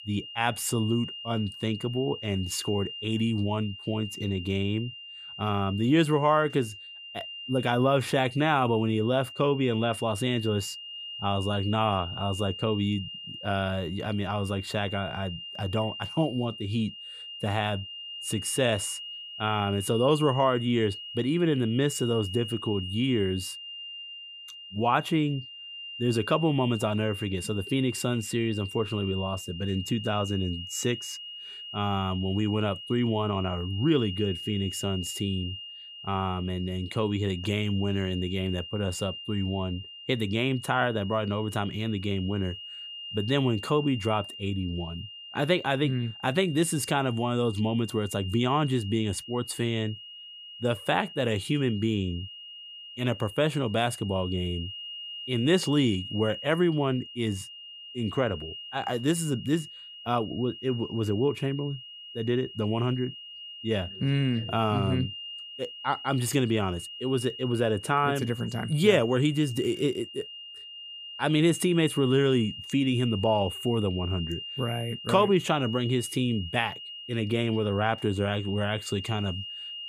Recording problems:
high-pitched whine; noticeable; throughout; 3 kHz, 10 dB below the speech

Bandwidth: 15 kHz